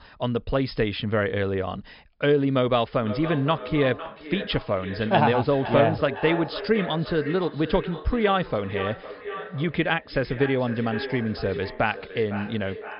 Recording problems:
echo of what is said; strong; from 3 s on; 510 ms later, 10 dB below the speech
high frequencies cut off; noticeable; nothing above 5.5 kHz

